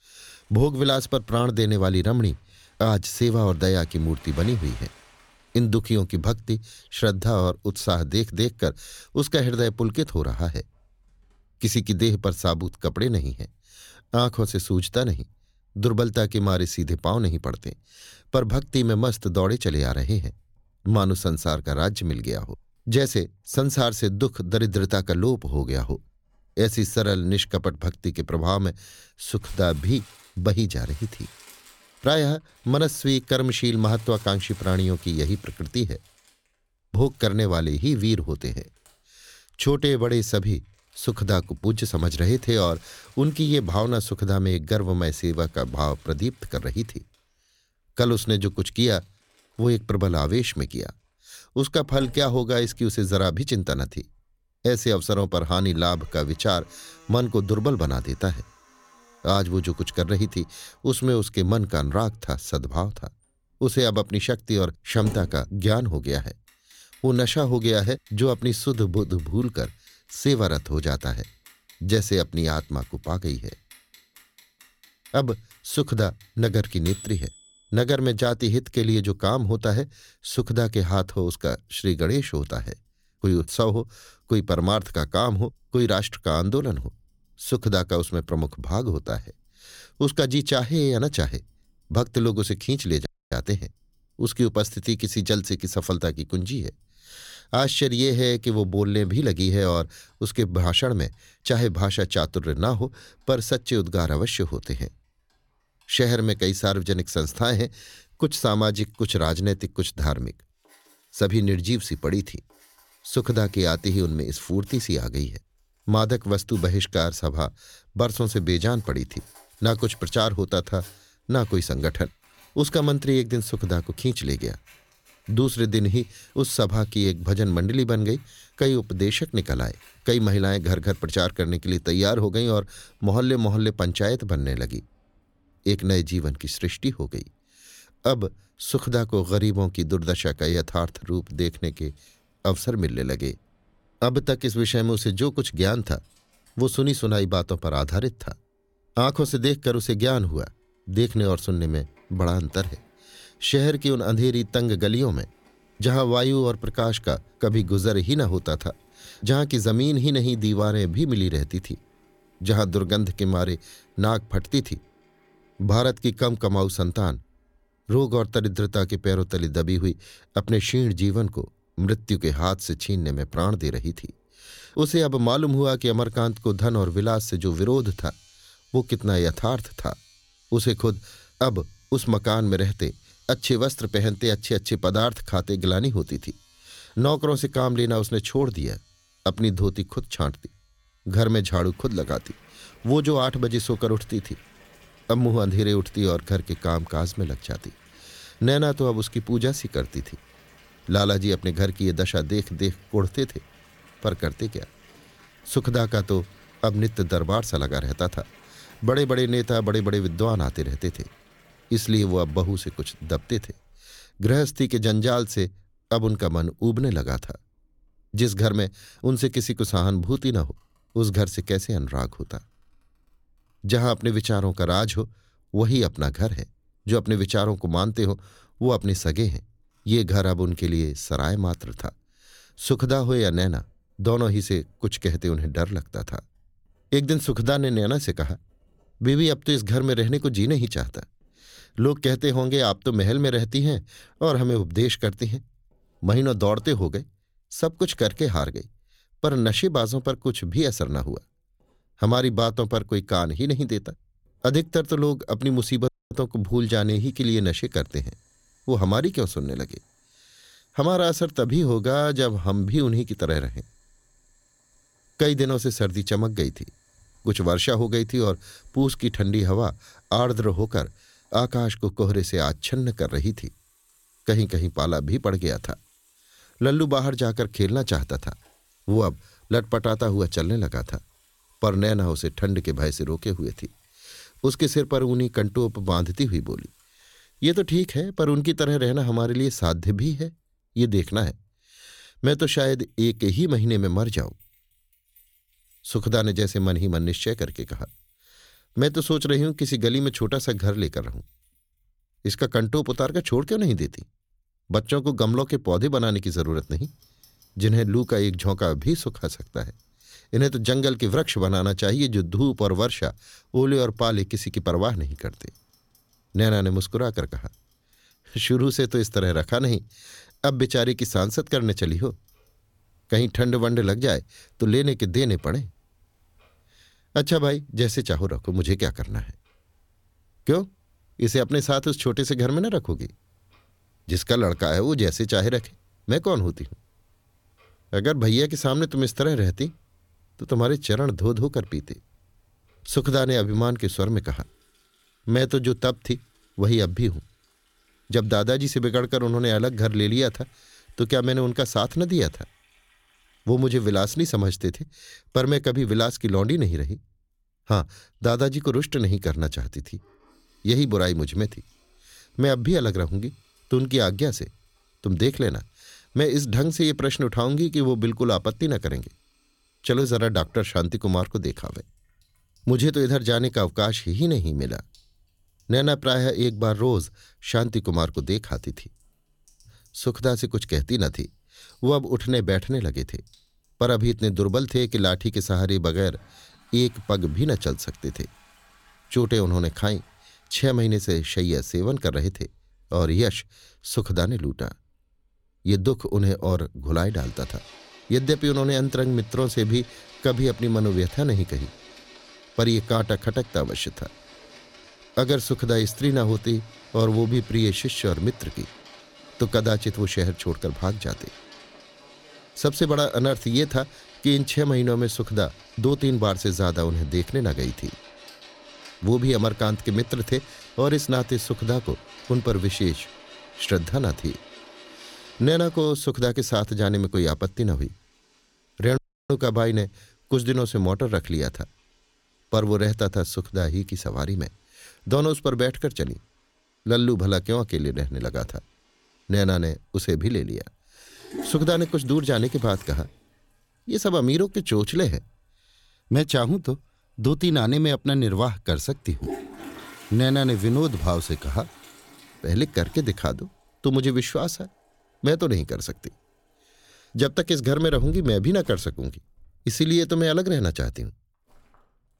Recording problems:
household noises; faint; throughout; 25 dB below the speech
audio cutting out; at 1:33, at 4:16 and at 7:09

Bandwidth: 17 kHz